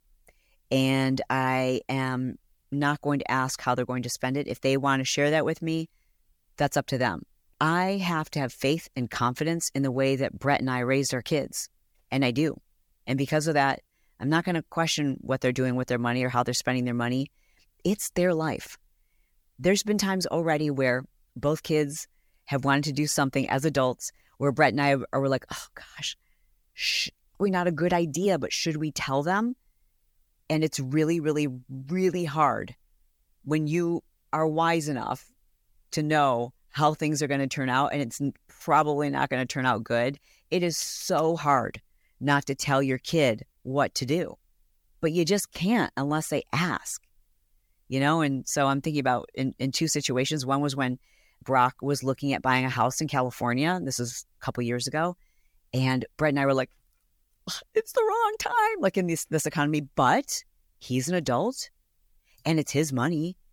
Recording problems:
none

